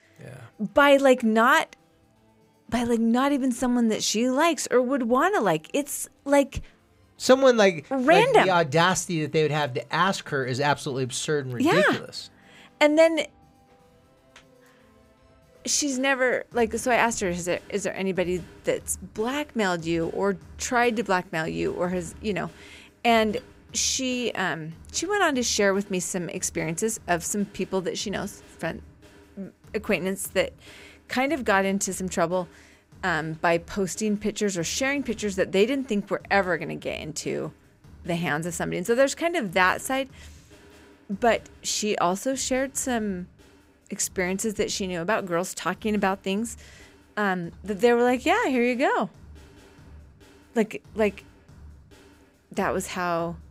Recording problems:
background music; faint; throughout; 25 dB below the speech

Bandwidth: 15.5 kHz